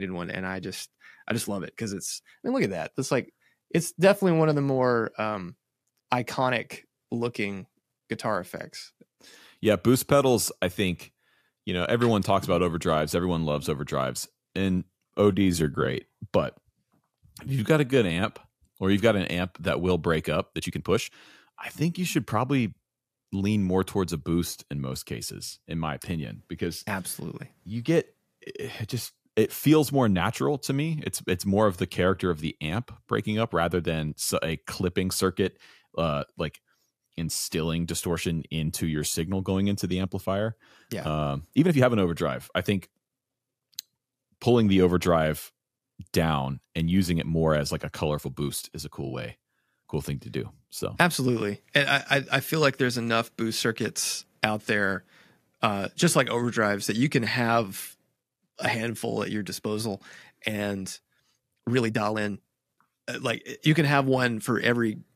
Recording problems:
abrupt cut into speech; at the start
uneven, jittery; strongly; from 1.5 s to 1:02

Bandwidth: 14.5 kHz